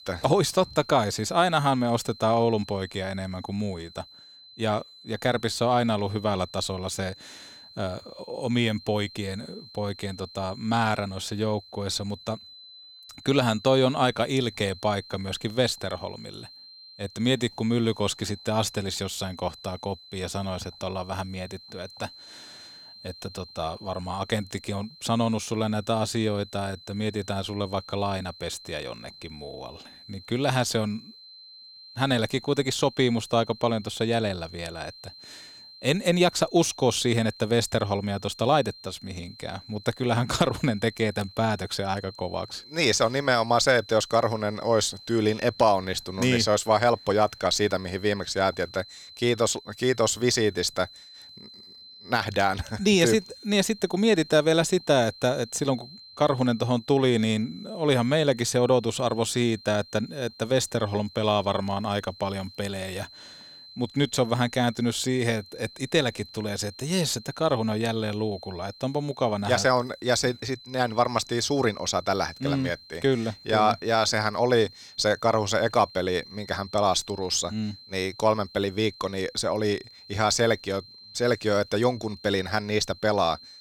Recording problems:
high-pitched whine; noticeable; throughout; 4 kHz, 20 dB below the speech

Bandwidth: 18.5 kHz